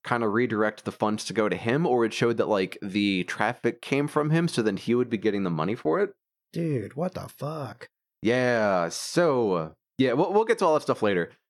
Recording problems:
none

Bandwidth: 17 kHz